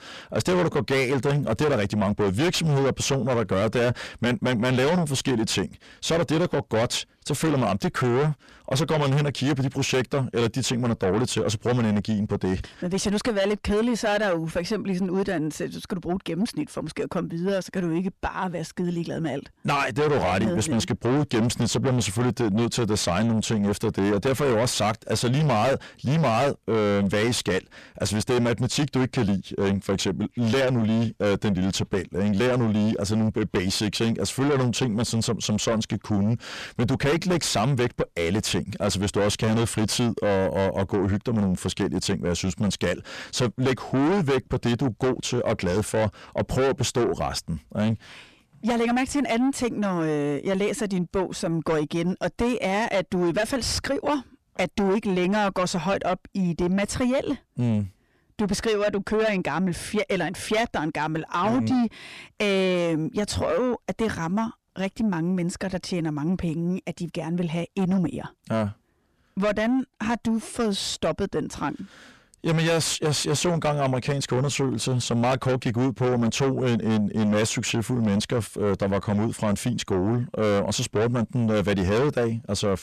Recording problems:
distortion; heavy; 5 dB below the speech

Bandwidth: 14 kHz